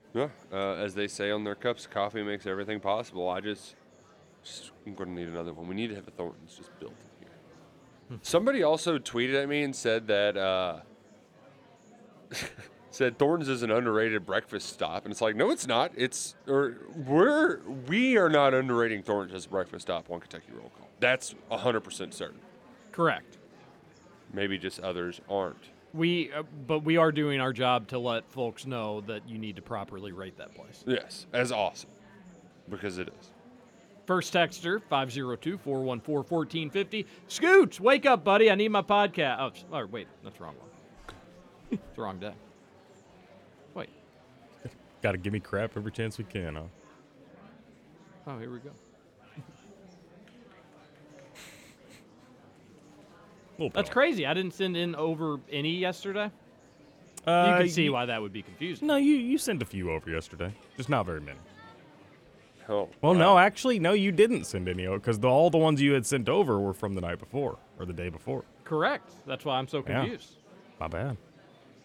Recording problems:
murmuring crowd; faint; throughout; 25 dB below the speech

